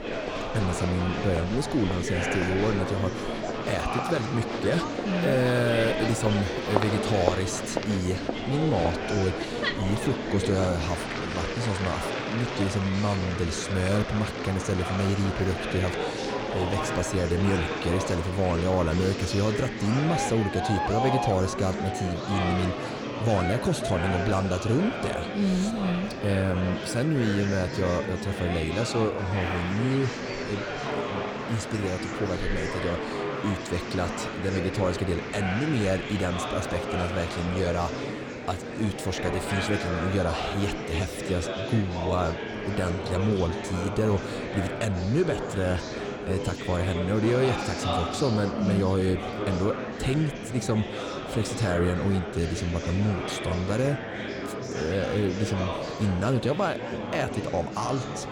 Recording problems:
murmuring crowd; loud; throughout; 3 dB below the speech

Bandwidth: 17.5 kHz